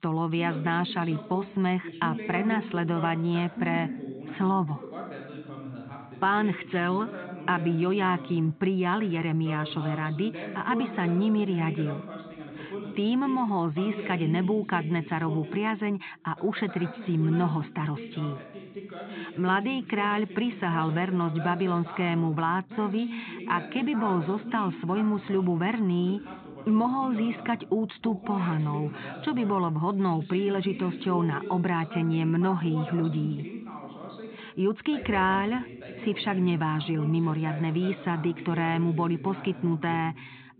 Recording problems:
high frequencies cut off; severe; nothing above 4 kHz
voice in the background; noticeable; throughout; 10 dB below the speech

